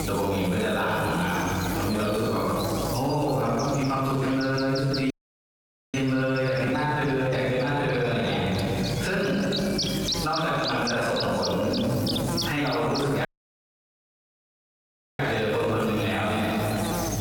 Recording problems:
room echo; strong; dies away in 2 s
off-mic speech; far
squashed, flat; somewhat
electrical hum; loud; throughout; 50 Hz, 7 dB below the speech
audio cutting out; at 5 s for 1 s and at 13 s for 2 s

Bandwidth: 18.5 kHz